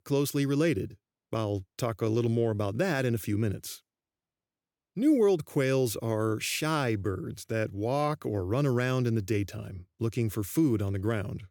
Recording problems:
none

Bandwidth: 18 kHz